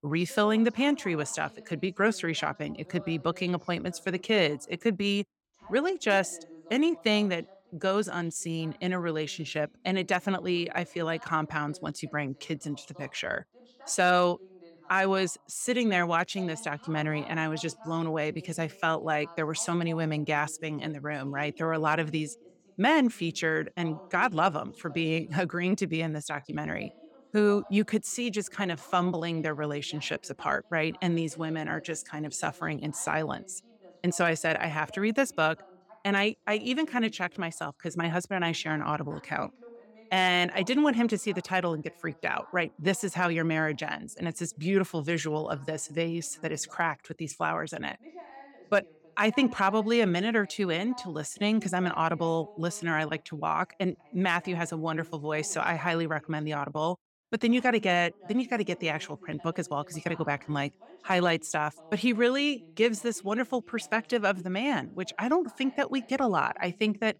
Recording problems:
voice in the background; faint; throughout; 25 dB below the speech

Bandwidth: 17.5 kHz